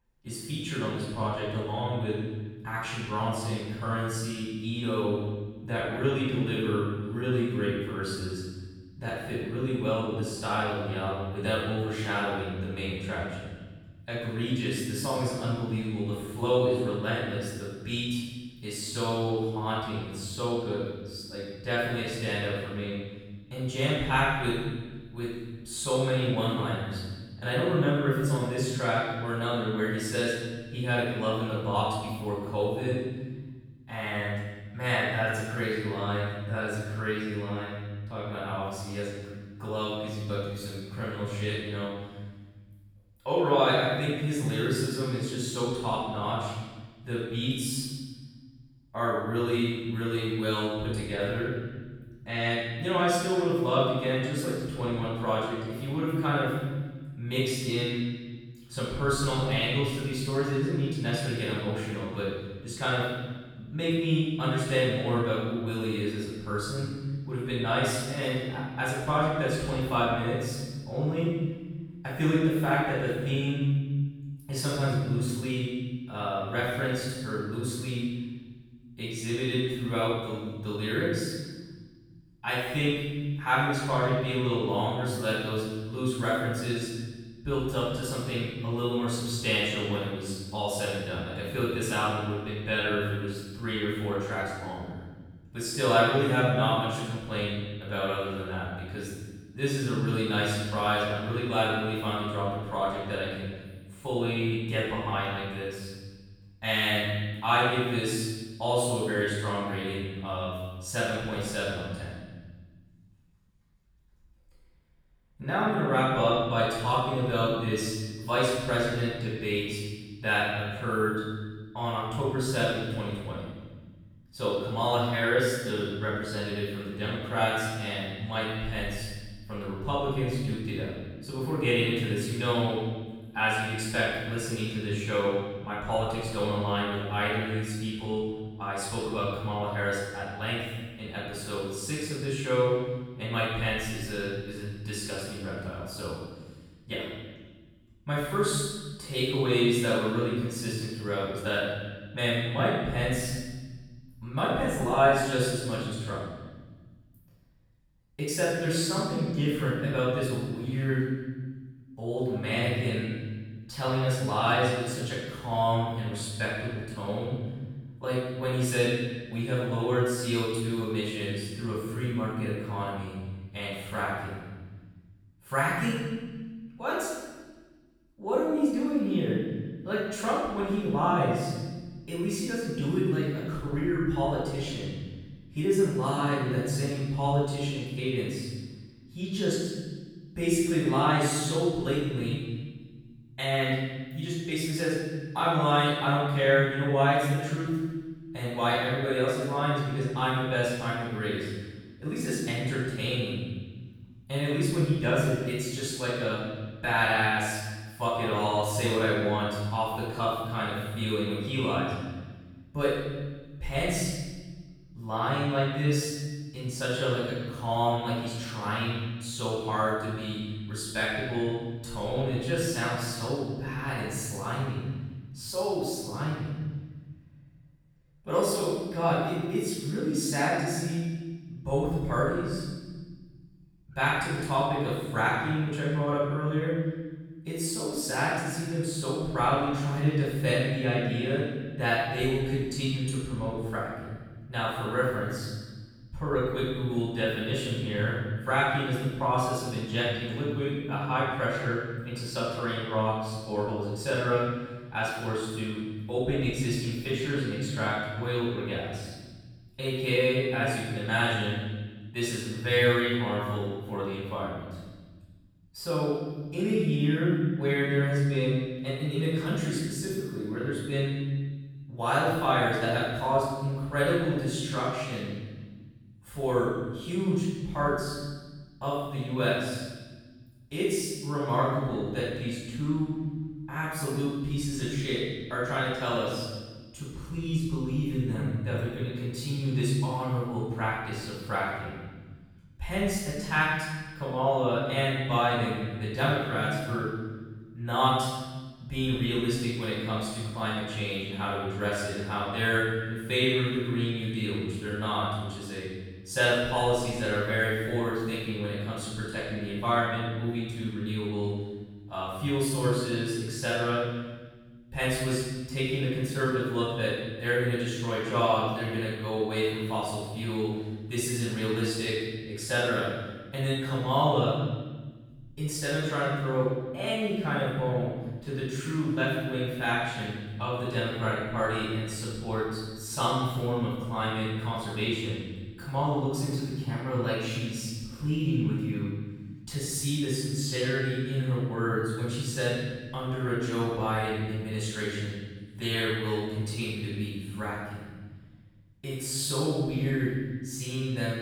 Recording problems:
room echo; strong; dies away in 1.5 s
off-mic speech; far

